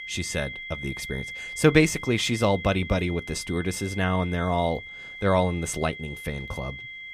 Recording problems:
high-pitched whine; noticeable; throughout; 2 kHz, 10 dB below the speech

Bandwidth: 15 kHz